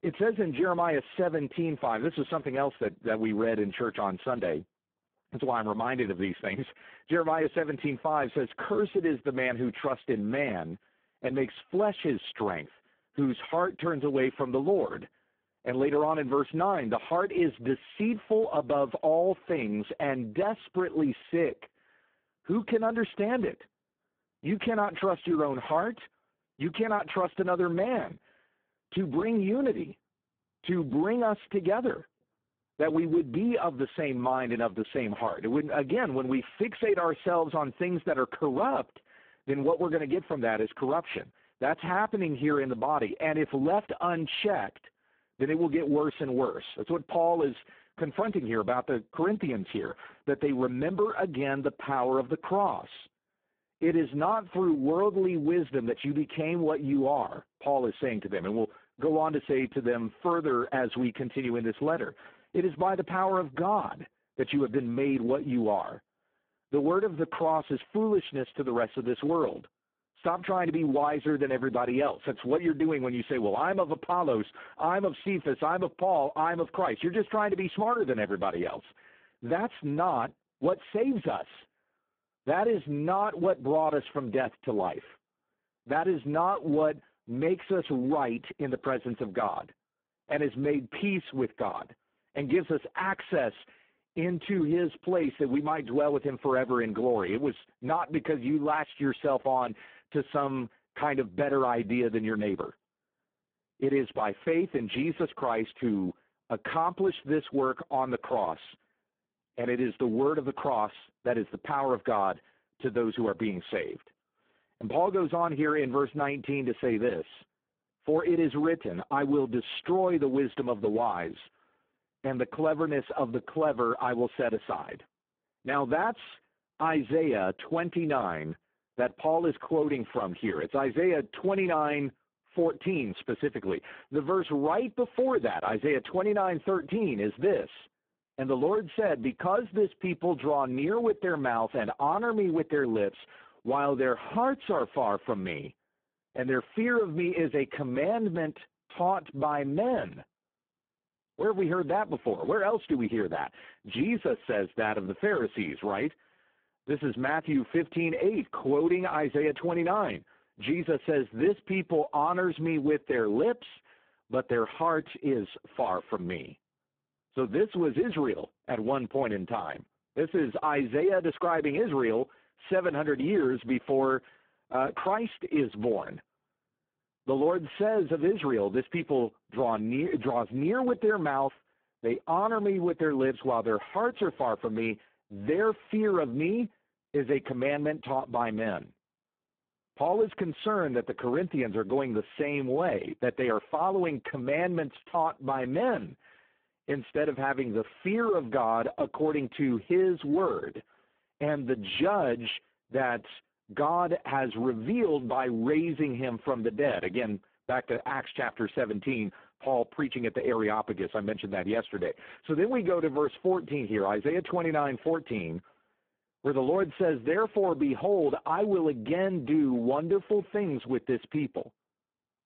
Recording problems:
phone-call audio; poor line

